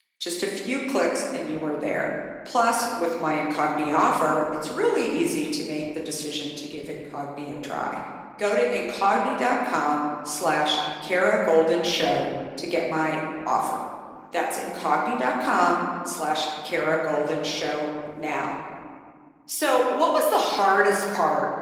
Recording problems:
room echo; noticeable; dies away in 1.6 s
thin; somewhat; fading below 350 Hz
off-mic speech; somewhat distant
garbled, watery; slightly

